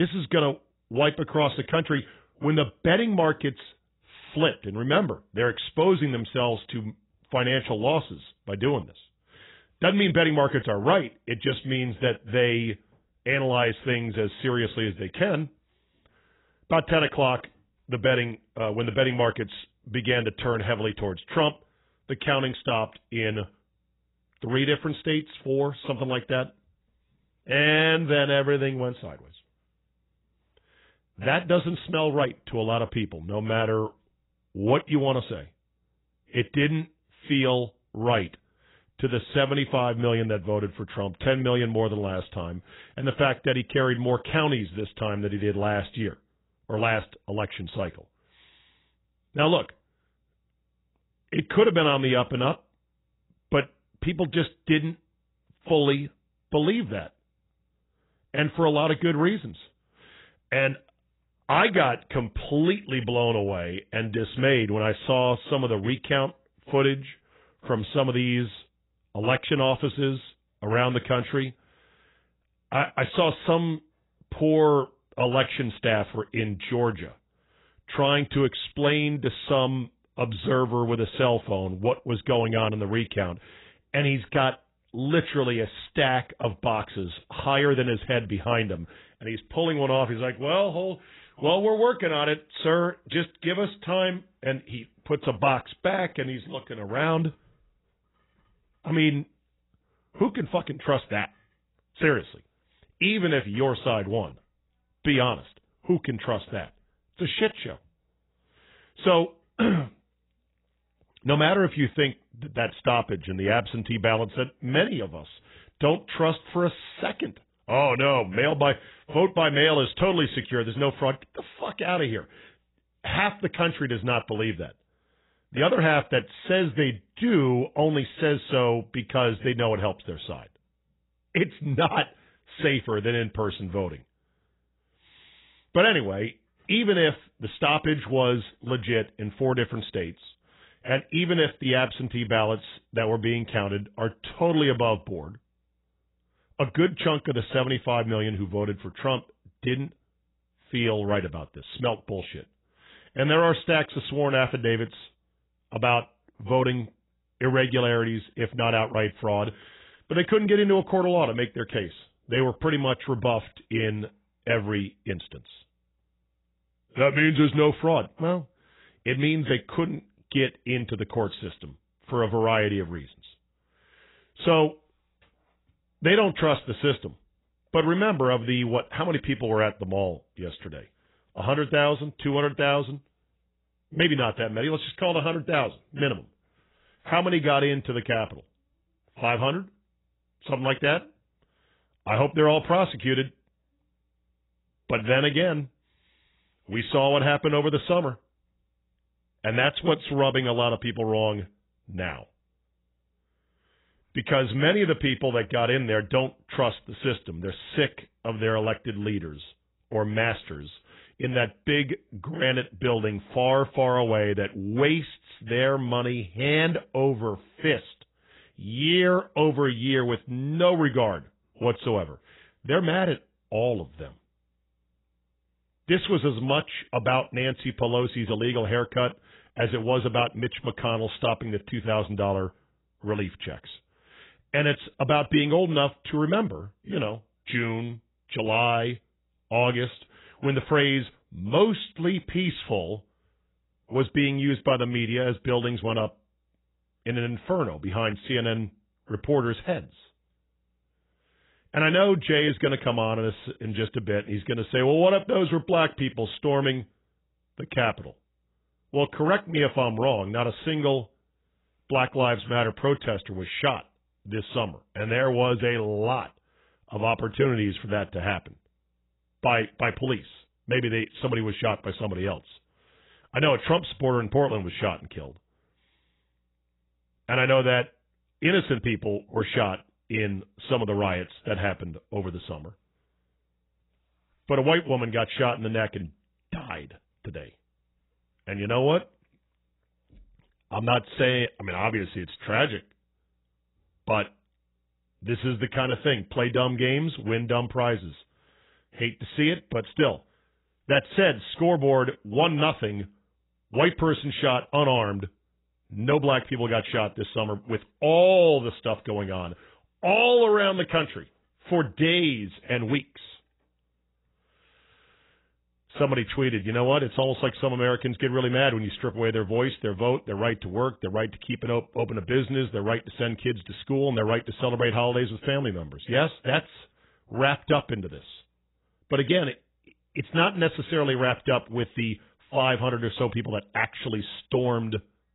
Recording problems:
garbled, watery; badly; nothing above 3.5 kHz
abrupt cut into speech; at the start

